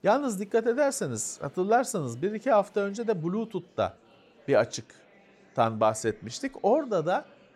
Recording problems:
murmuring crowd; faint; throughout; 30 dB below the speech

